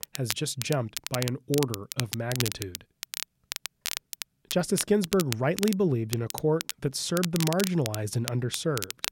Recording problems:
crackle, like an old record; loud; 7 dB below the speech

